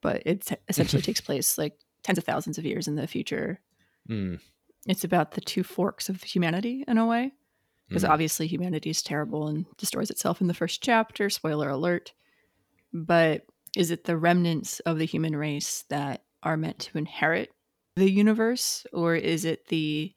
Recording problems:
uneven, jittery; strongly; from 2 to 19 s

